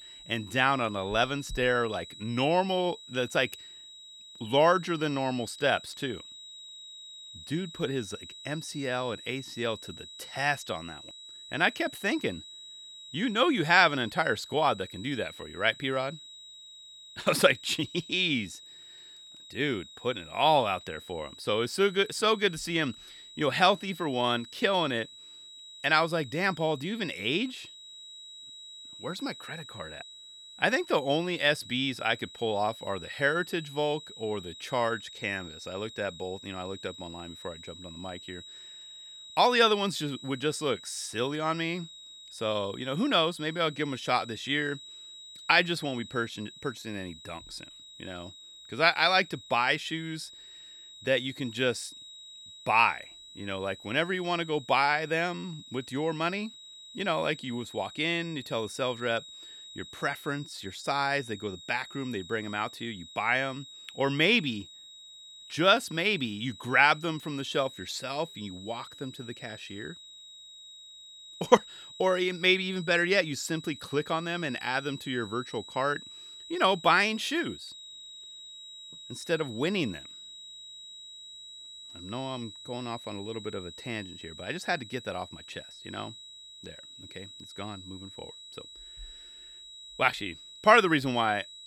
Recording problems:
high-pitched whine; noticeable; throughout; 4 kHz, 15 dB below the speech

